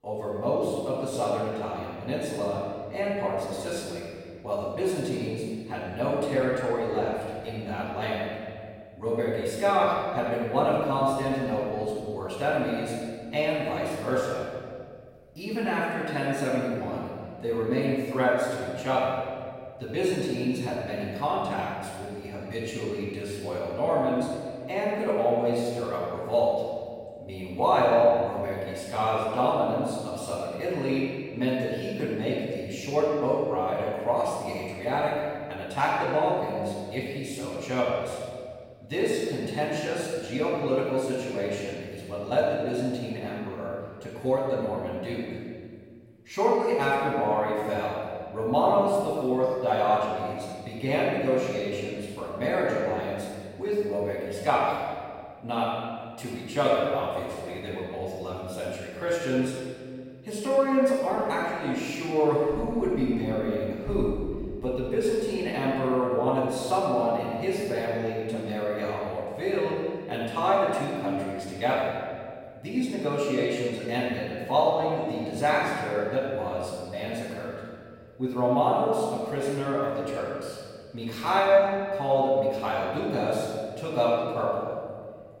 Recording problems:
room echo; strong; dies away in 1.9 s
off-mic speech; far

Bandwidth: 16.5 kHz